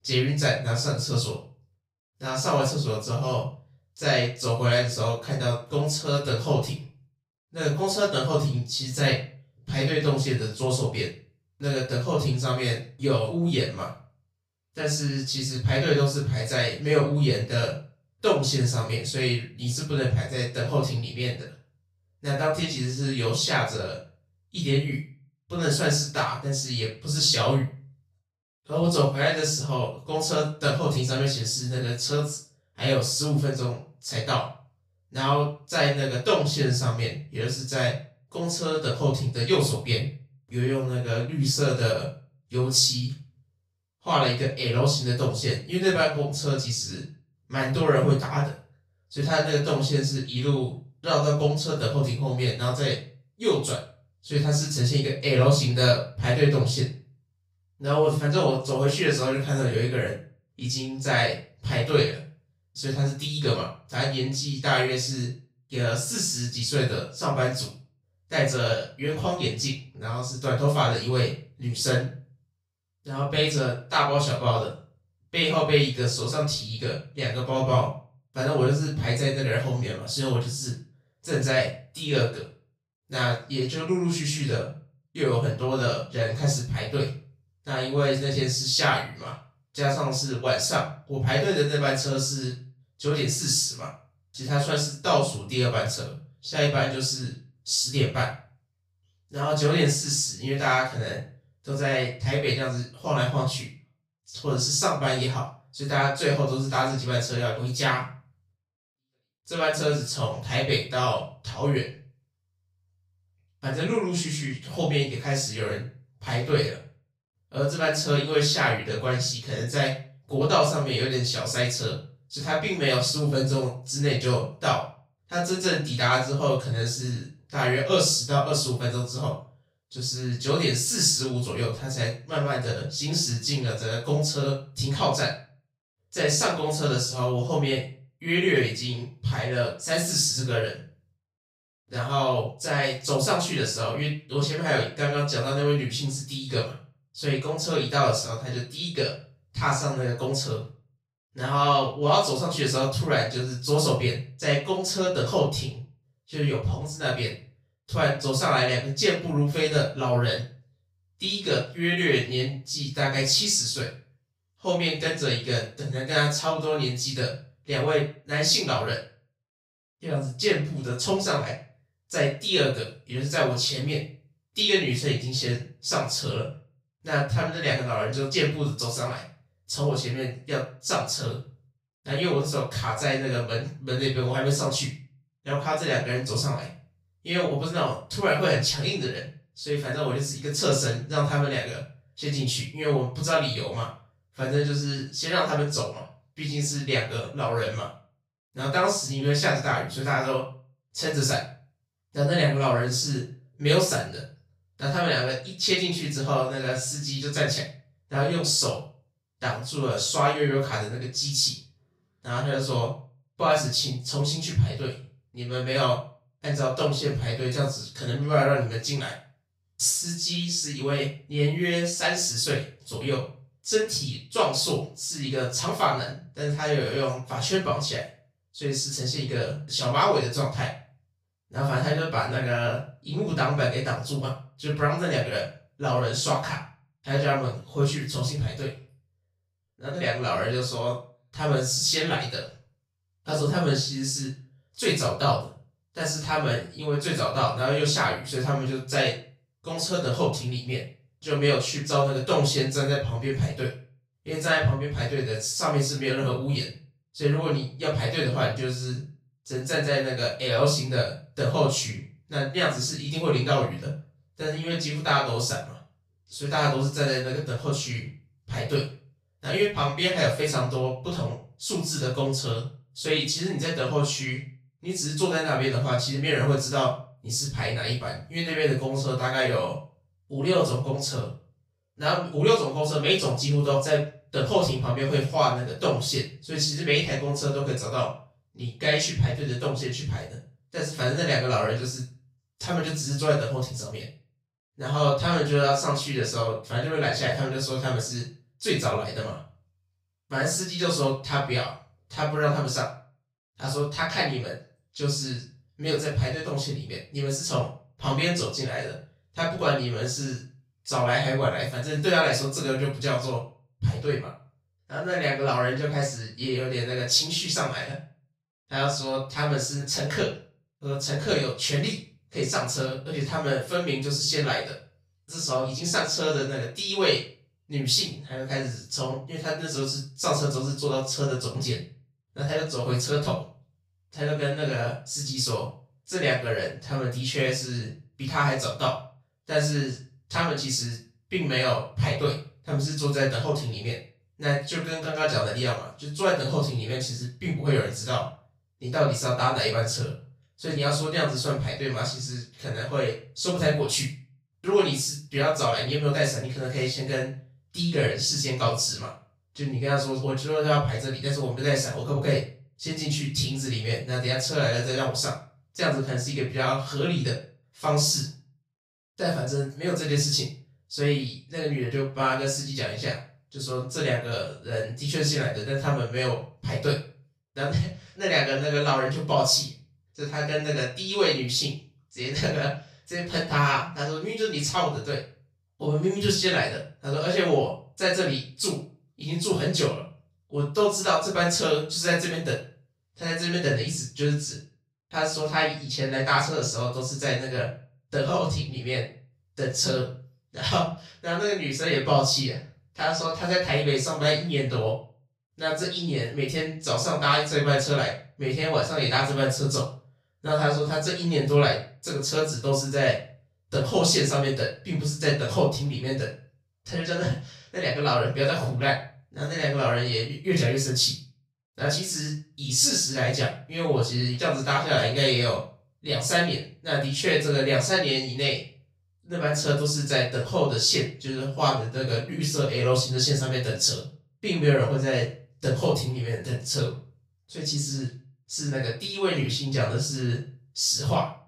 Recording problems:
off-mic speech; far
room echo; noticeable; dies away in 0.3 s

